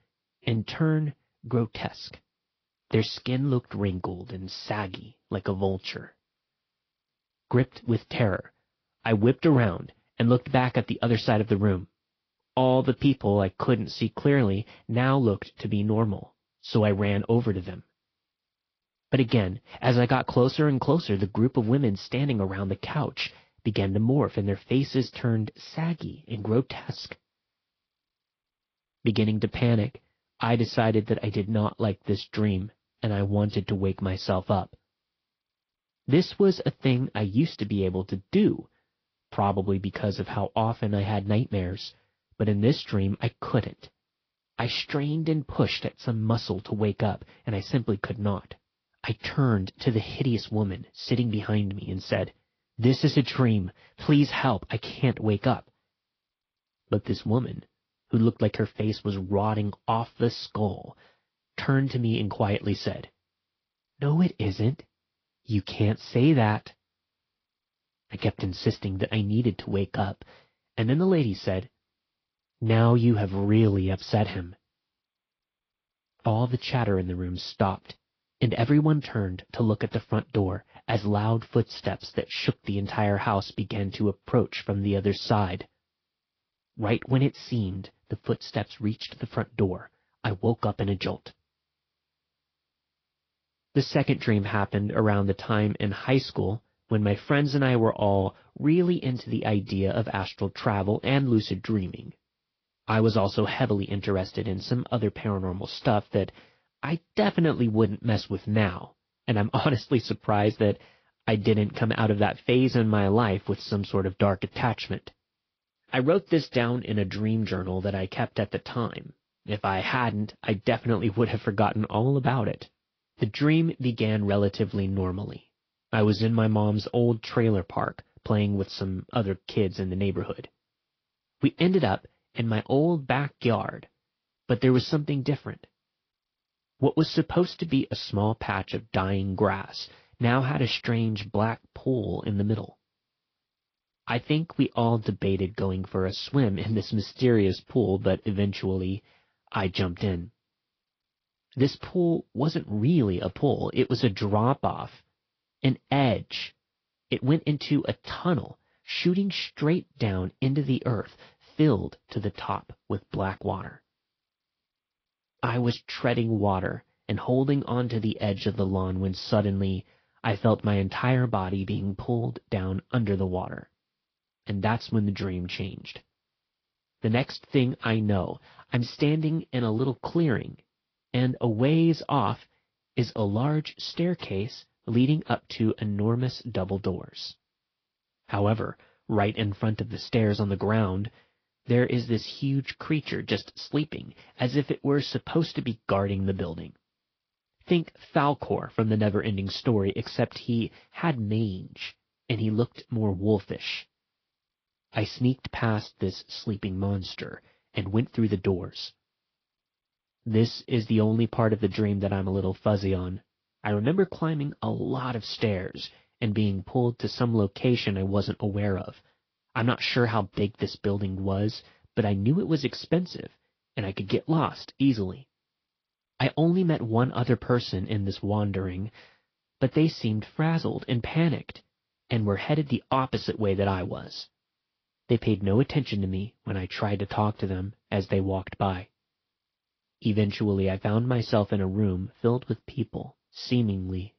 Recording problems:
high frequencies cut off; noticeable; nothing above 5.5 kHz
garbled, watery; slightly

